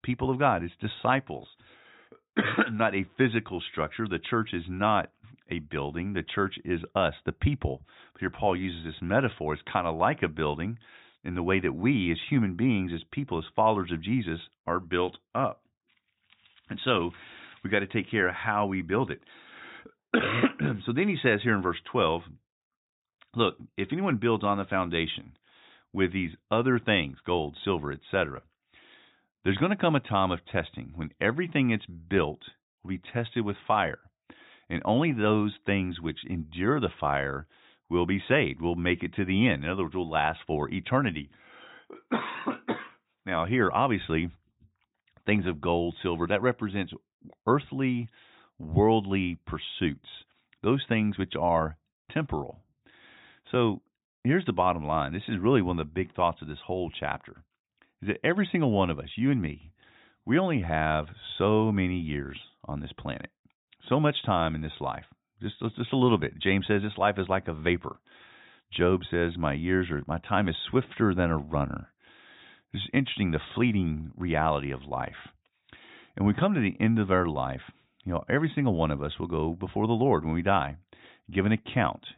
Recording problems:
high frequencies cut off; severe; nothing above 4 kHz

